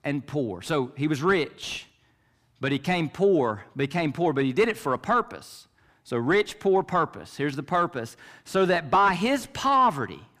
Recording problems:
distortion; slight; 10 dB below the speech

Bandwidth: 15 kHz